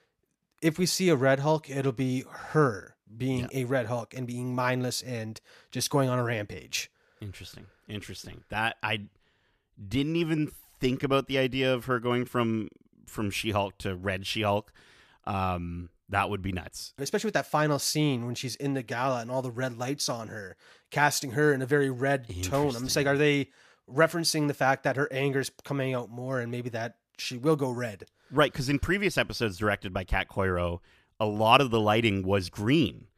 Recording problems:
none

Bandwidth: 14.5 kHz